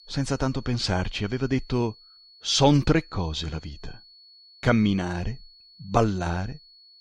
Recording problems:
high-pitched whine; faint; throughout; 4.5 kHz, 25 dB below the speech

